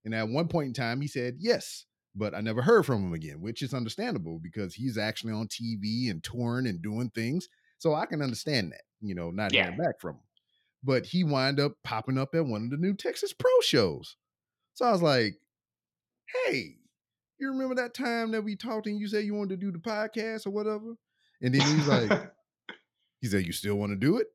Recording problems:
none

